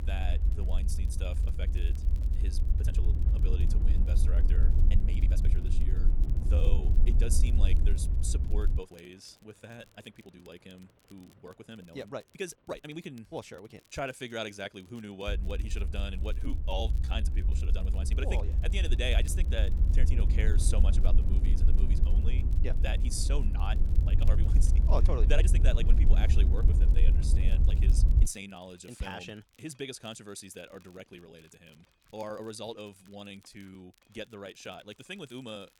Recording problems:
wrong speed, natural pitch; too fast; 1.5 times normal speed
low rumble; loud; until 9 s and from 15 to 28 s; 6 dB below the speech
rain or running water; faint; throughout; 25 dB below the speech
crackle, like an old record; faint; 25 dB below the speech
uneven, jittery; strongly; from 3 to 34 s

